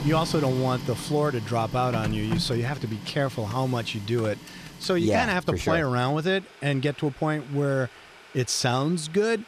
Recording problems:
household noises; noticeable; throughout; 10 dB below the speech

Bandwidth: 14.5 kHz